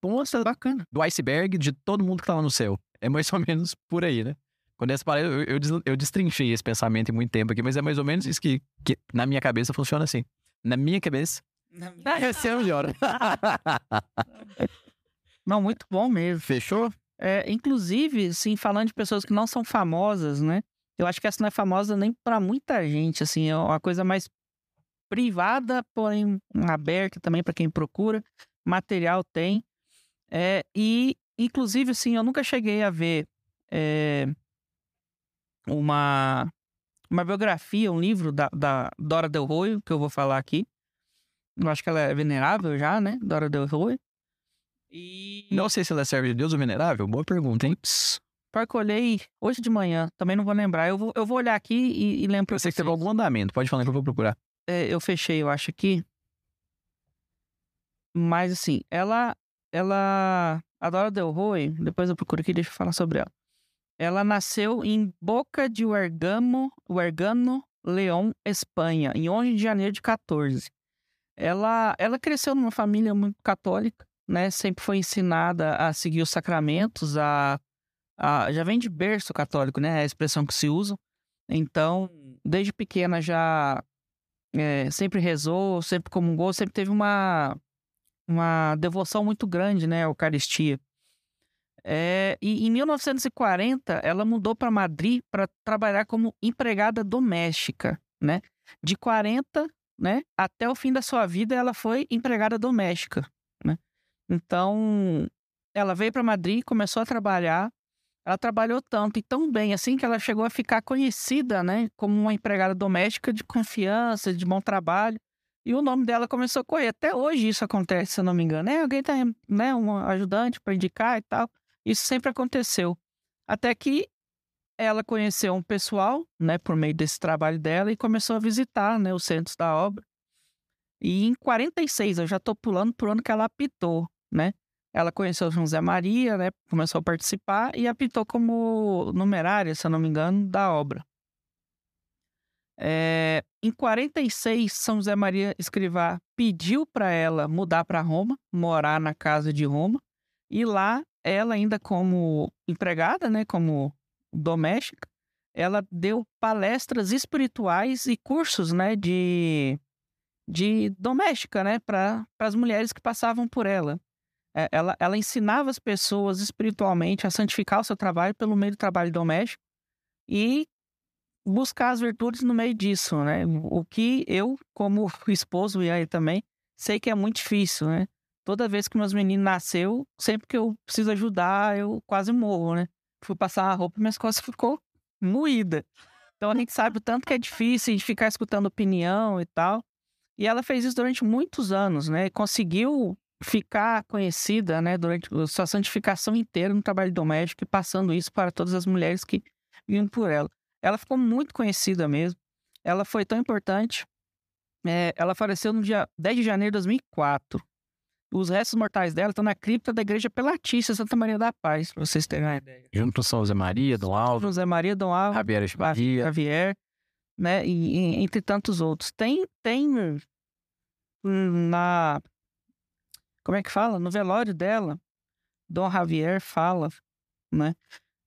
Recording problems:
uneven, jittery; strongly; from 0.5 s to 3:29

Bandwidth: 14.5 kHz